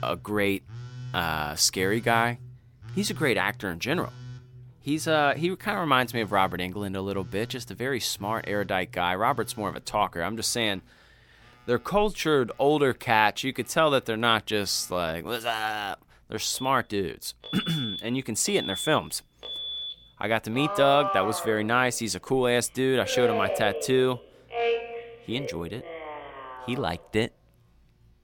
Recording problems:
alarms or sirens; loud; throughout; 9 dB below the speech

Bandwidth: 17.5 kHz